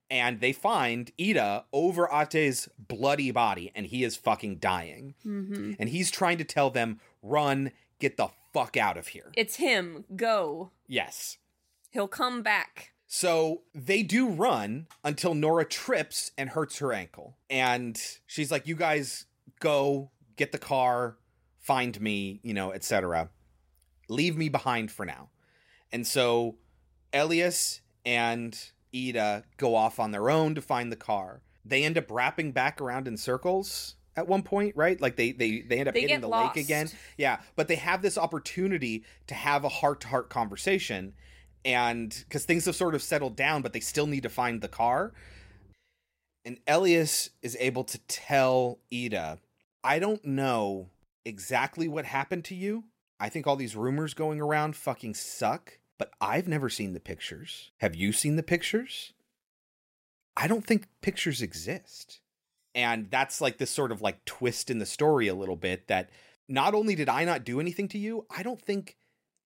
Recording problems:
none

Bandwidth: 16 kHz